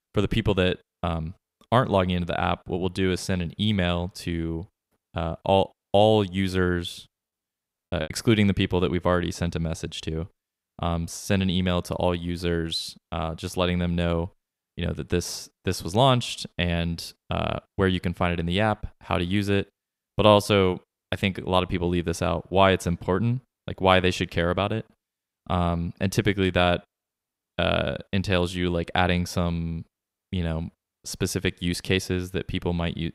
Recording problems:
choppy; occasionally; at 8 s; 4% of the speech affected

